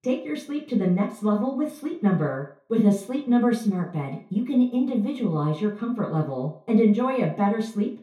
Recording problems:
off-mic speech; far
room echo; slight; dies away in 0.4 s

